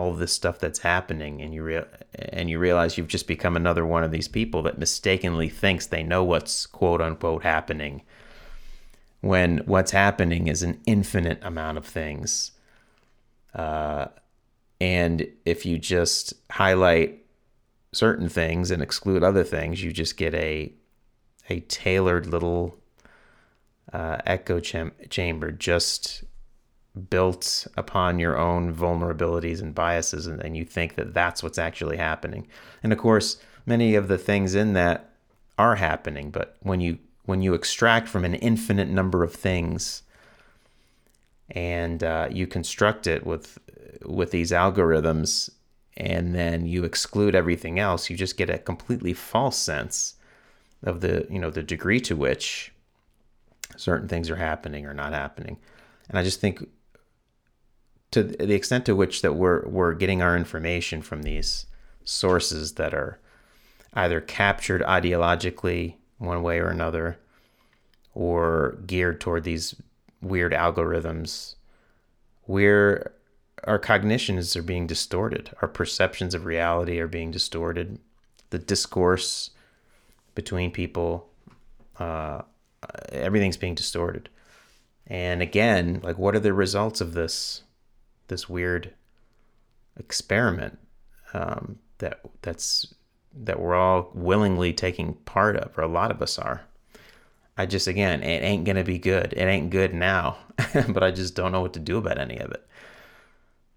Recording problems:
abrupt cut into speech; at the start

